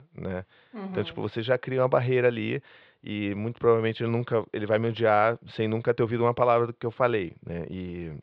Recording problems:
muffled; very; fading above 3.5 kHz

